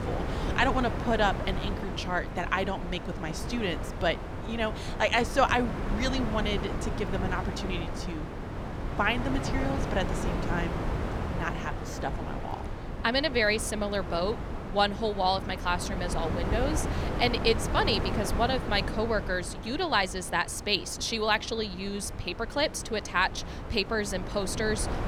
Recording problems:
wind noise on the microphone; heavy; 9 dB below the speech

